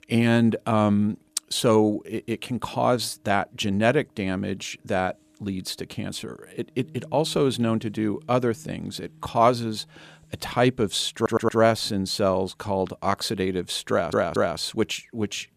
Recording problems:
background music; faint; throughout; 30 dB below the speech
audio stuttering; at 11 s and at 14 s

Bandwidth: 14.5 kHz